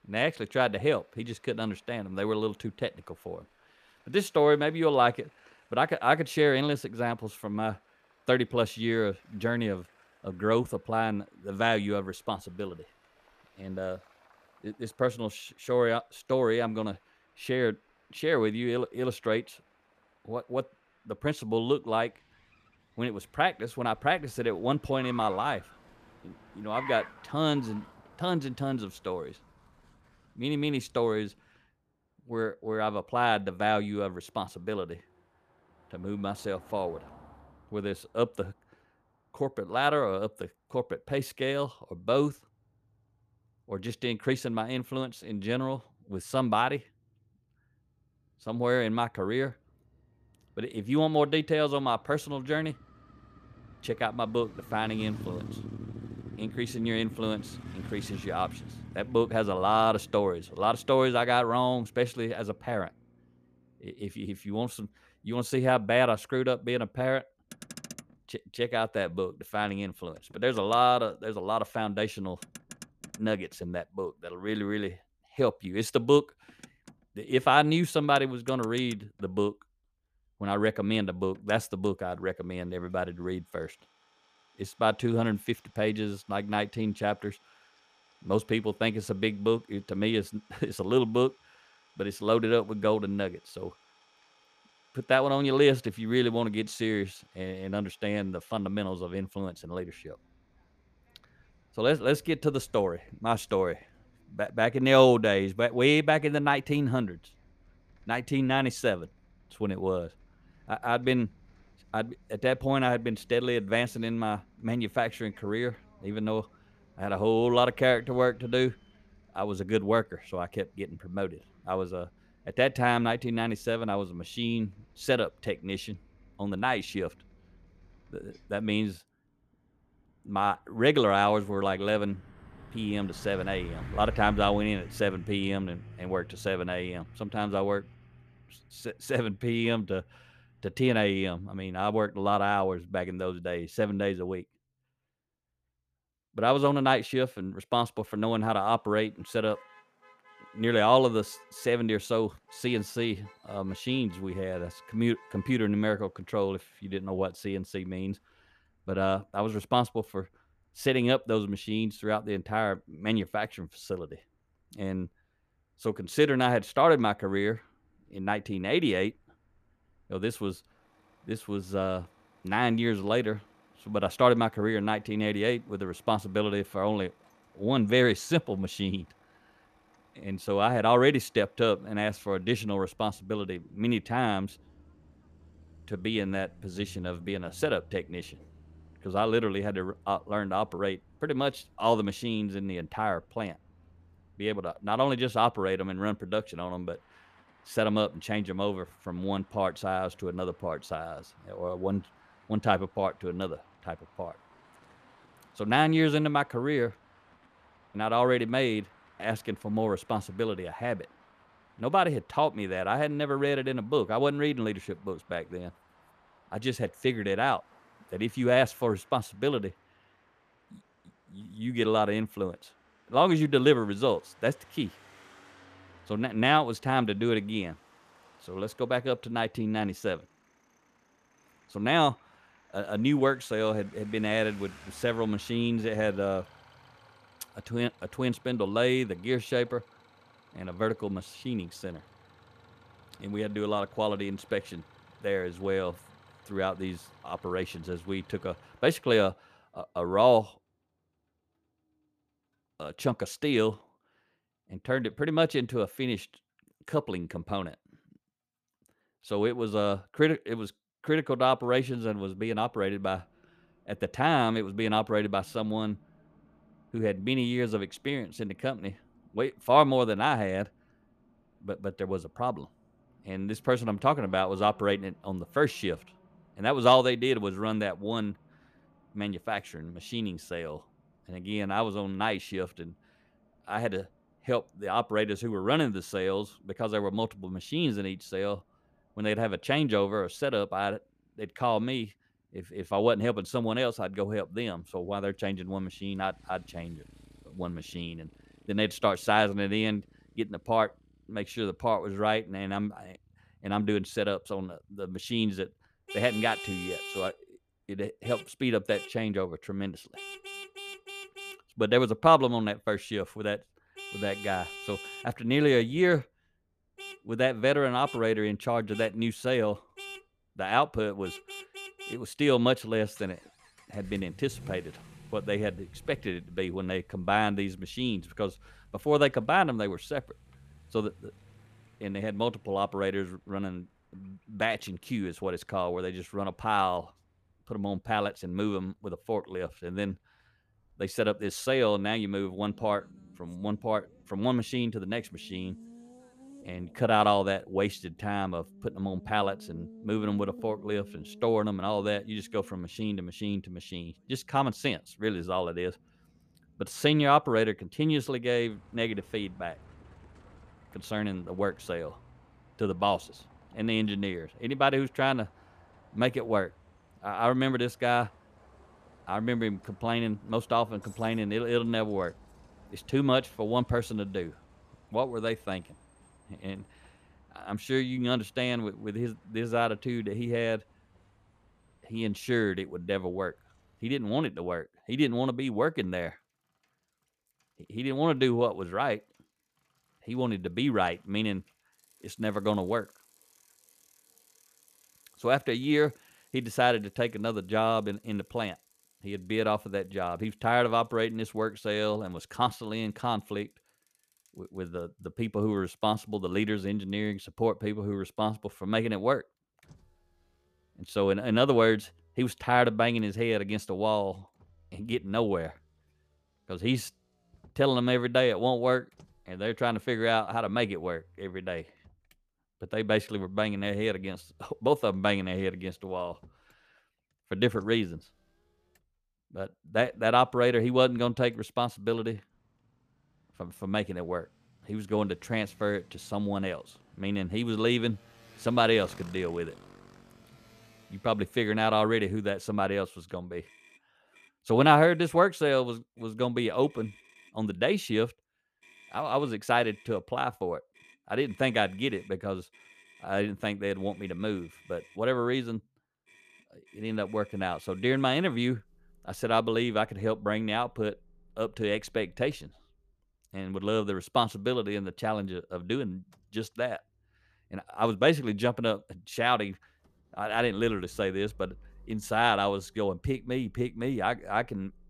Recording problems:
traffic noise; faint; throughout; 20 dB below the speech

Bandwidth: 14.5 kHz